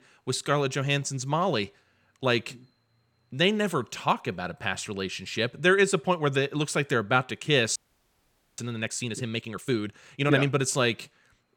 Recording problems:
audio freezing; at 8 s for 1 s

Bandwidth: 18.5 kHz